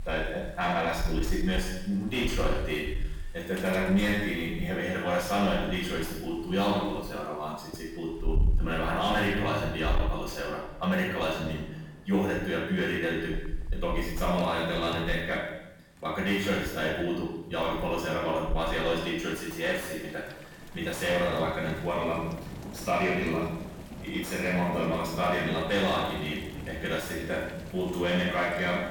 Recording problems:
off-mic speech; far
room echo; noticeable; dies away in 0.8 s
distortion; slight; 9 dB below the speech
rain or running water; loud; throughout; 10 dB below the speech

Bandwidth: 18.5 kHz